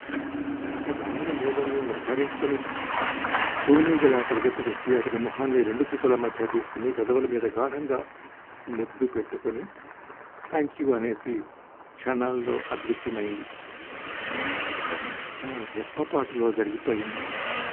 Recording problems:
phone-call audio; poor line
traffic noise; loud; throughout; 6 dB below the speech

